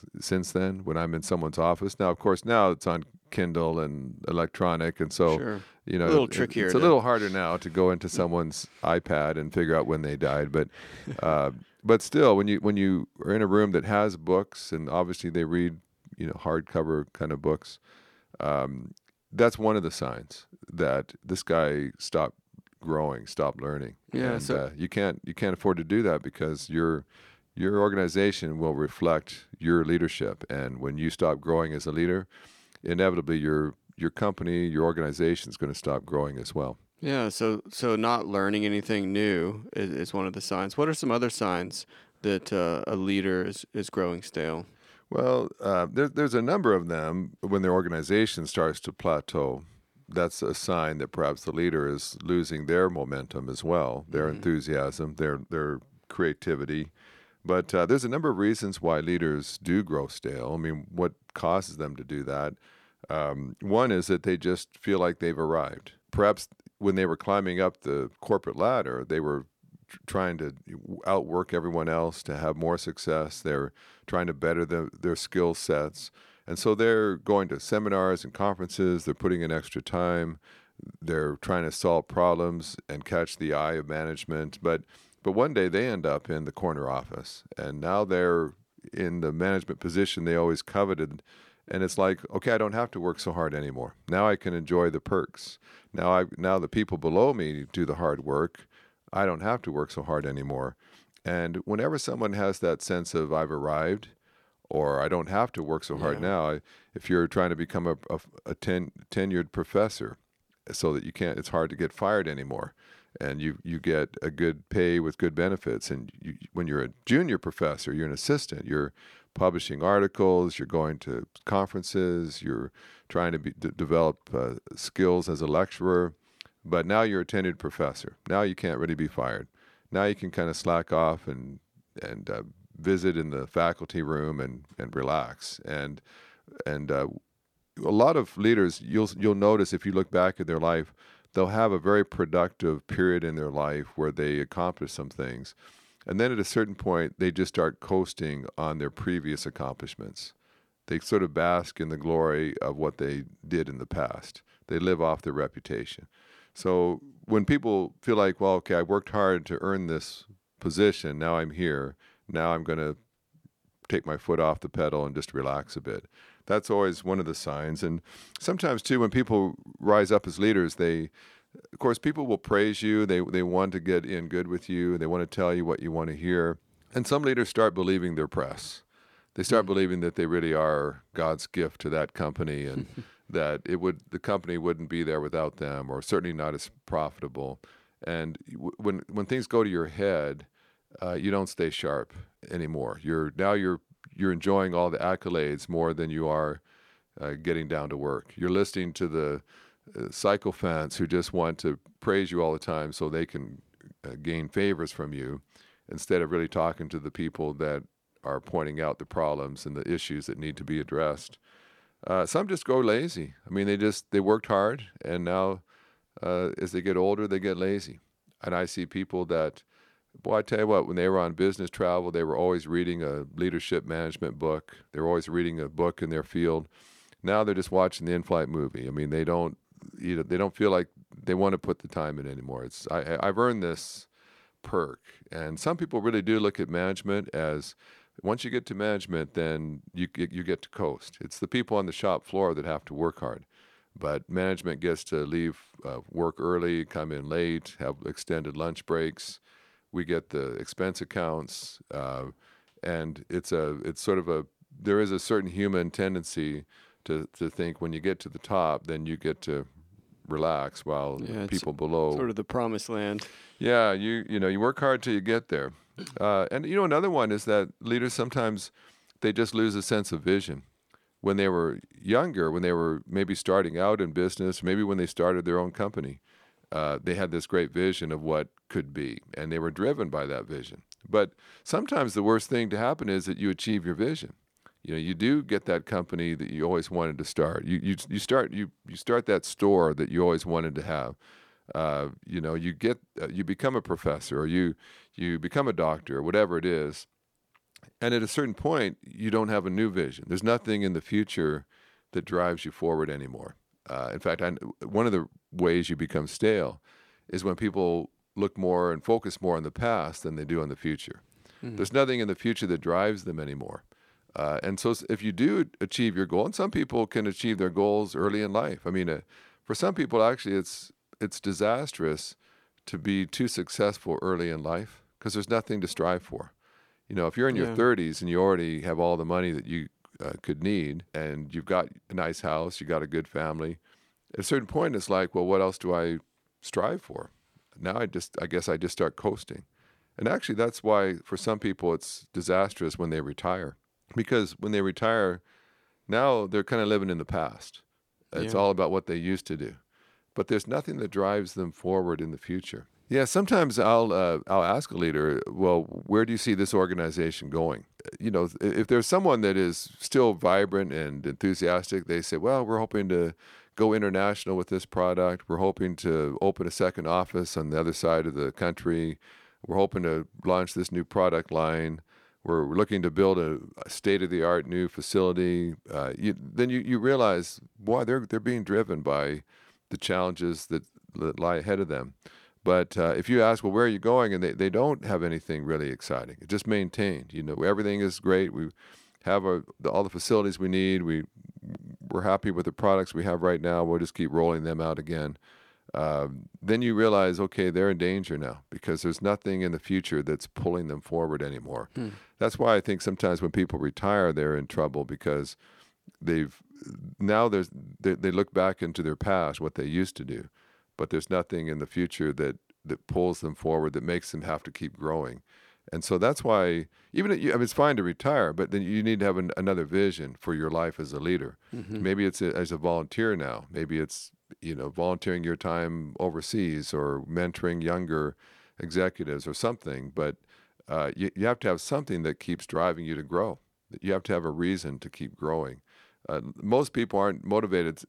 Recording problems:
none

